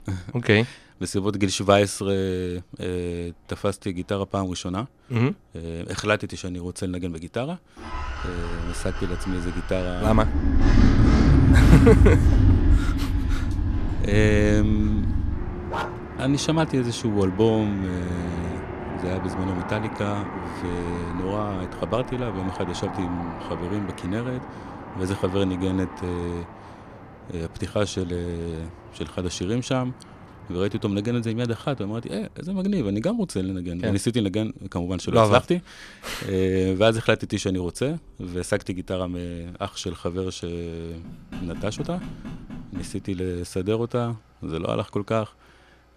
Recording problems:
traffic noise; very loud; throughout; as loud as the speech
dog barking; noticeable; at 16 s; peak 5 dB below the speech
door banging; faint; from 41 to 43 s; peak 10 dB below the speech

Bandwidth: 13.5 kHz